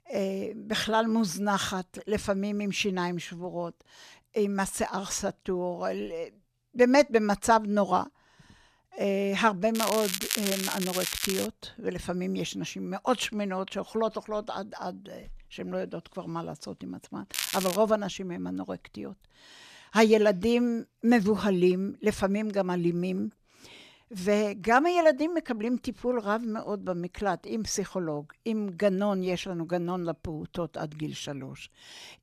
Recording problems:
crackling; loud; from 9.5 to 11 s and at 17 s; 3 dB below the speech

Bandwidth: 14.5 kHz